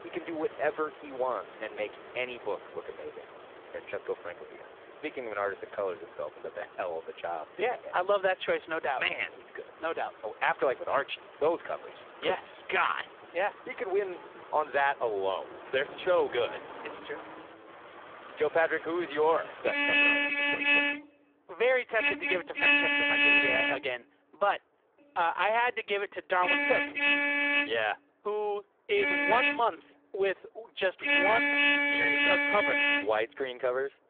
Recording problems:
phone-call audio; poor line; nothing above 3.5 kHz
traffic noise; very loud; throughout; 6 dB above the speech

